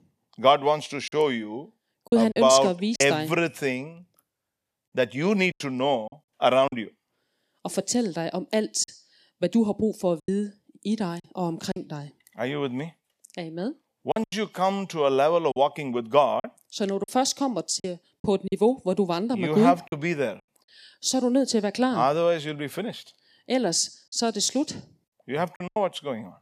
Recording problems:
choppy; very; 5% of the speech affected

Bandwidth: 14.5 kHz